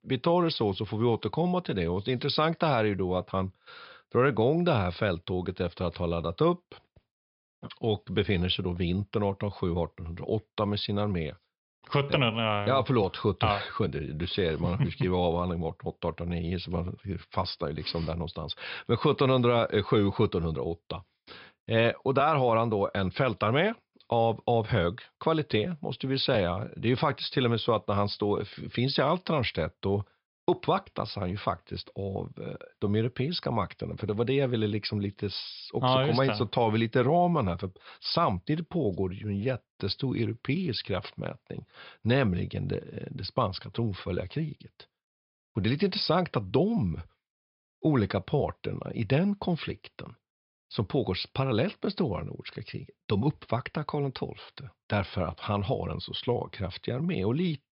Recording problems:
high frequencies cut off; noticeable; nothing above 5.5 kHz

